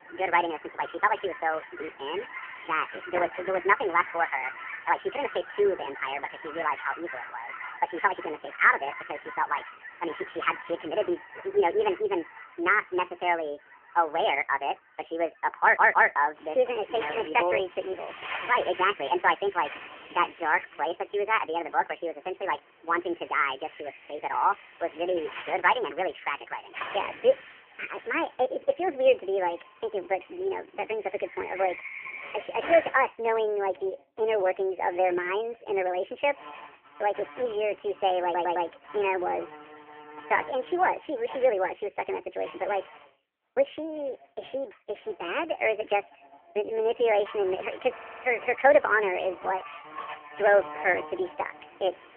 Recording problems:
phone-call audio; poor line; nothing above 3 kHz
wrong speed and pitch; too fast and too high; 1.5 times normal speed
animal sounds; noticeable; throughout; 15 dB below the speech
uneven, jittery; strongly; from 4.5 to 50 s
audio stuttering; at 16 s, at 38 s and at 48 s

